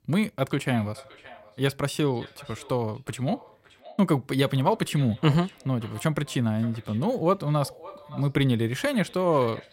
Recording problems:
echo of what is said; faint; throughout; 570 ms later, 20 dB below the speech

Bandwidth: 16 kHz